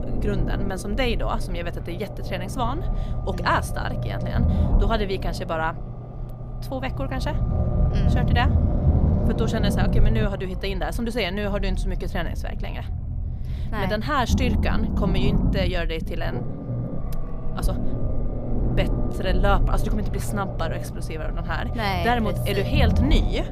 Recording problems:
low rumble; loud; throughout; 8 dB below the speech

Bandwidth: 15 kHz